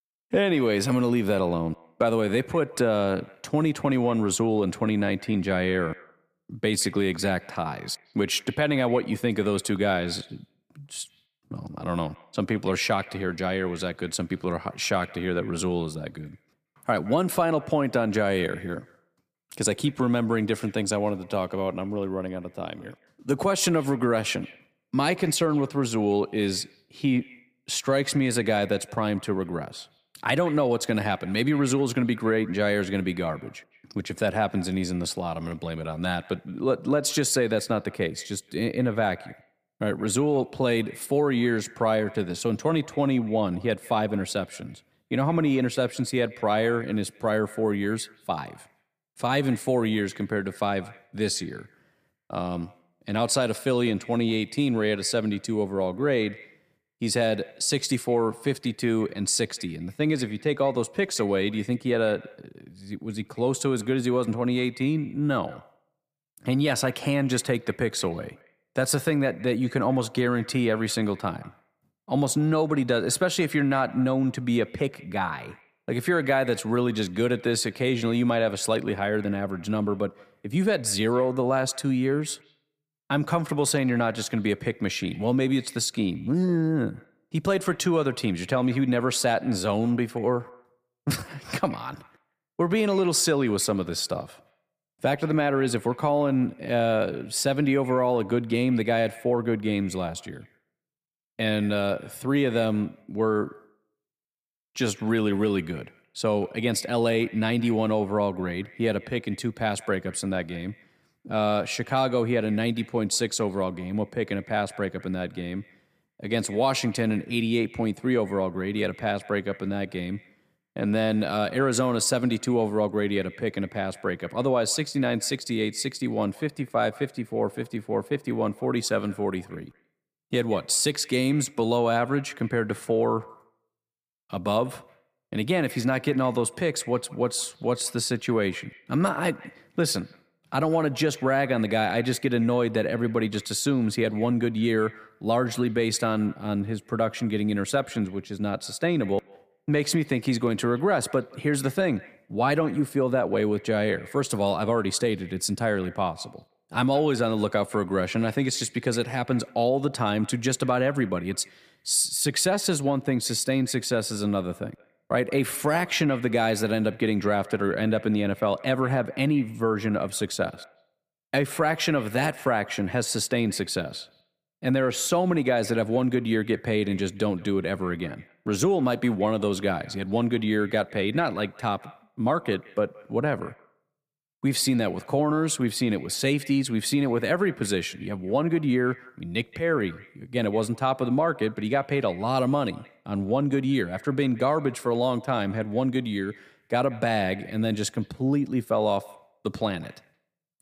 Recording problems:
echo of what is said; faint; throughout; 170 ms later, 25 dB below the speech

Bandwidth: 15 kHz